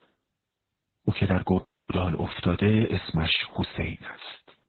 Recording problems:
garbled, watery; badly; nothing above 4 kHz
audio cutting out; at 1.5 s

